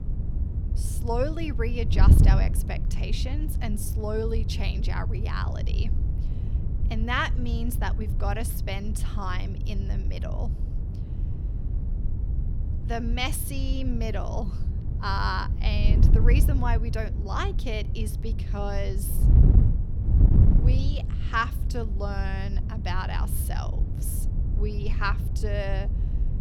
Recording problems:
wind noise on the microphone; heavy; 9 dB below the speech

